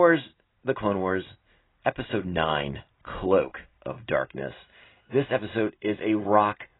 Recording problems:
garbled, watery; badly; nothing above 4 kHz
abrupt cut into speech; at the start

